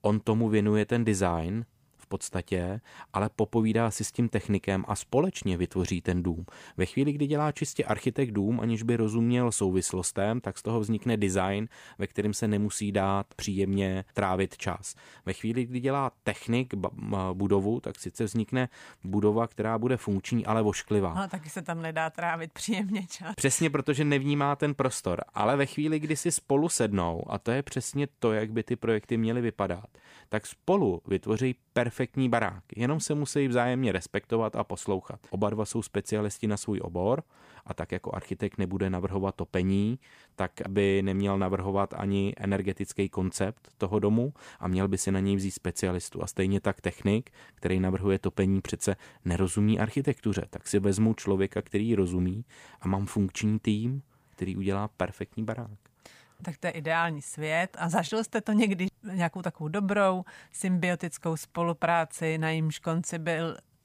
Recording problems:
none

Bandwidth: 15 kHz